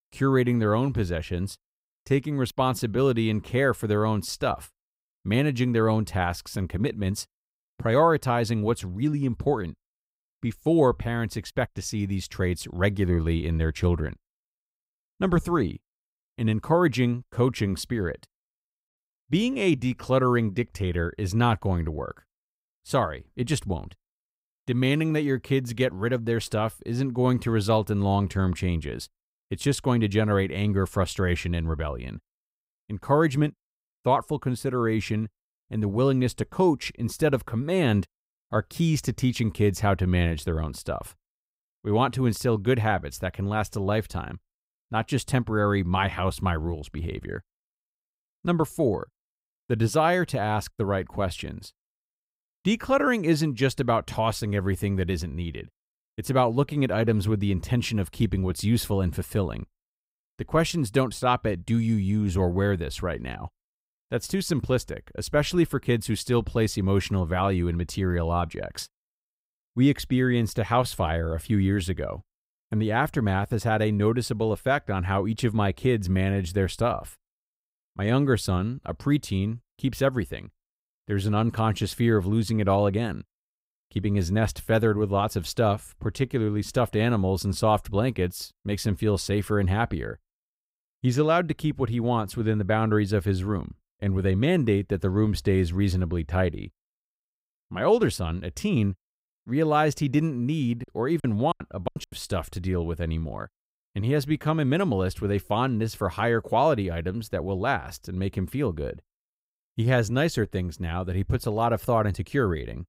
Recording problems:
choppy; very; from 1:41 to 1:42; 23% of the speech affected

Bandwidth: 15.5 kHz